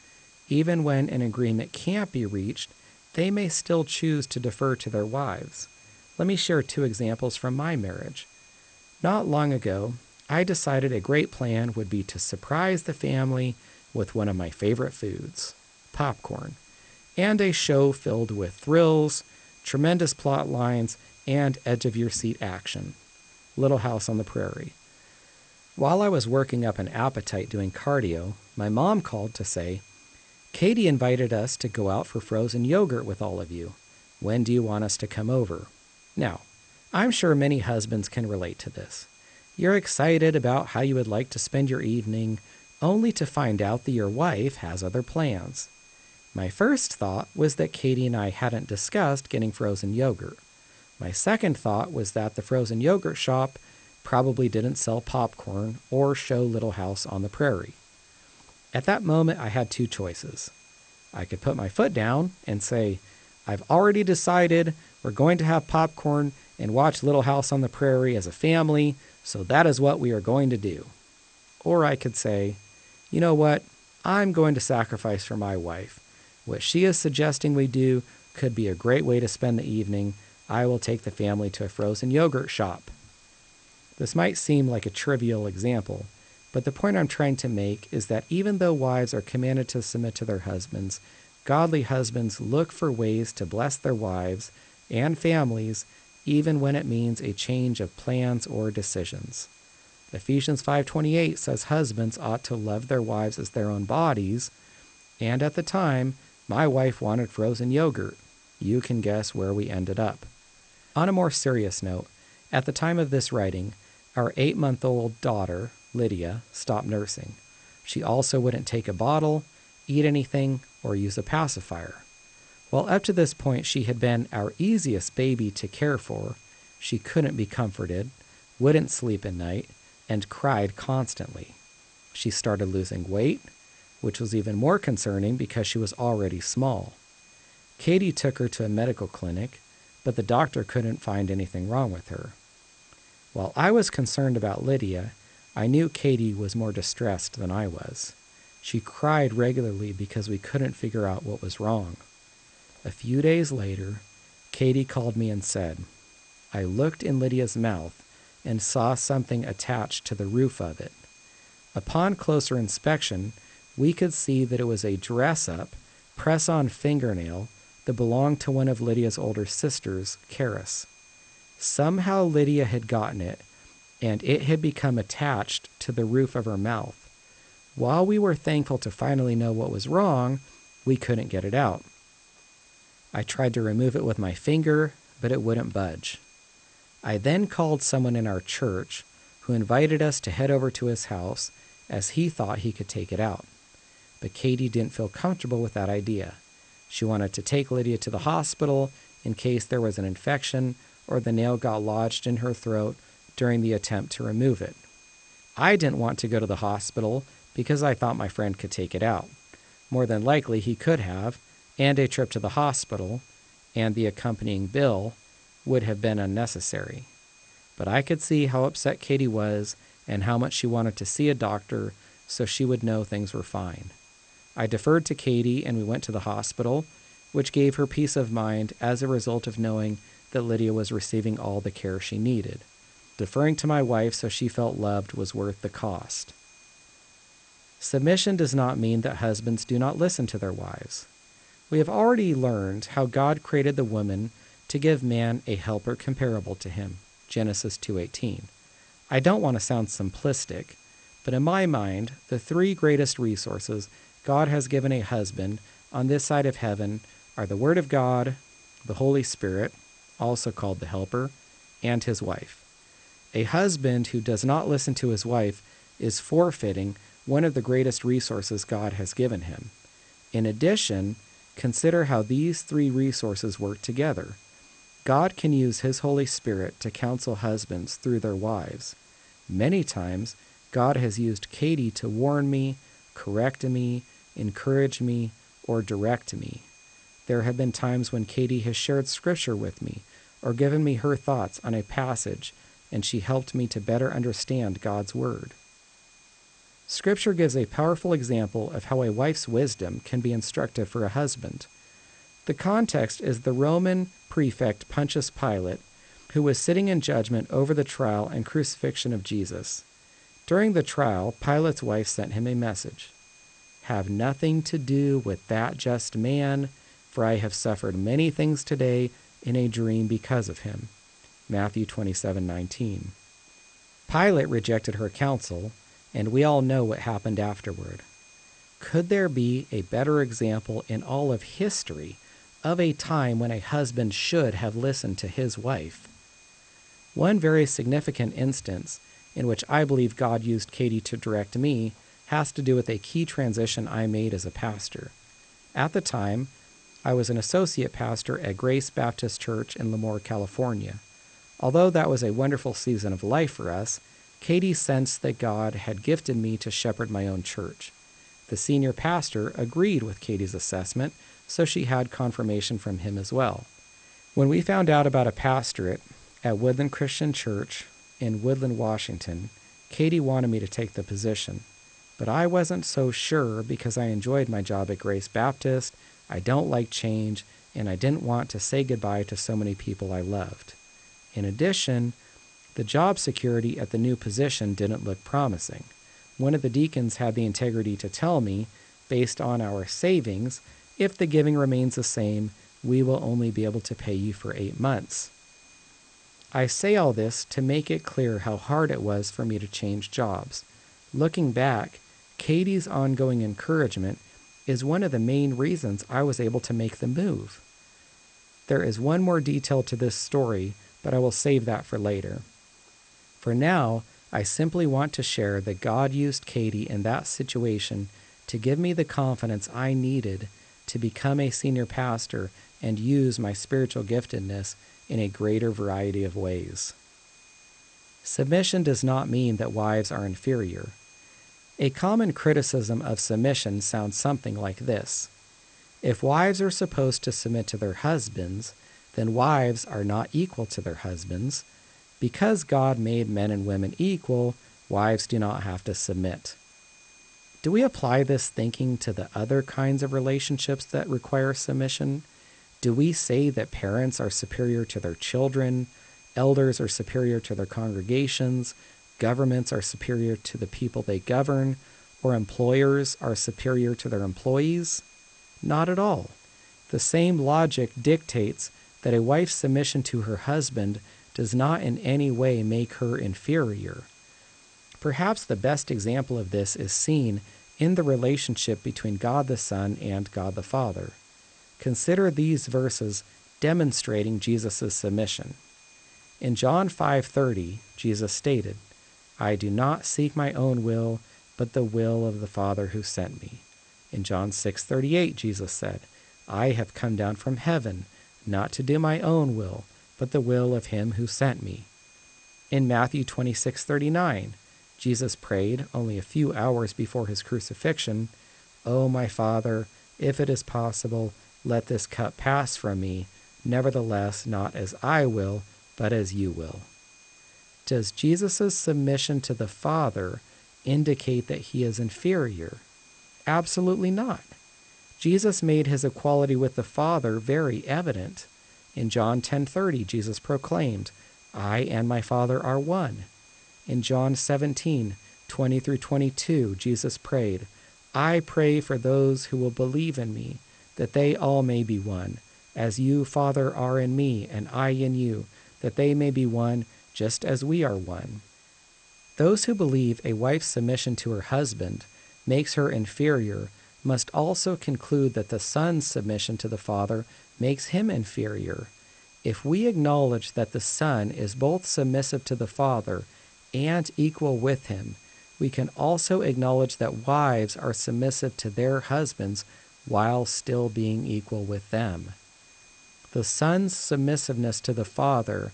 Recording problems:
garbled, watery; slightly; nothing above 8.5 kHz
high-pitched whine; faint; throughout; 2.5 kHz, 30 dB below the speech
hiss; faint; throughout; 30 dB below the speech

